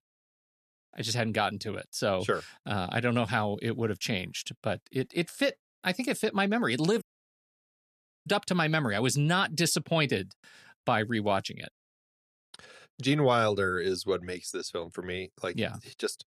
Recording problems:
audio cutting out; at 7 s for 1 s

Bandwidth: 14 kHz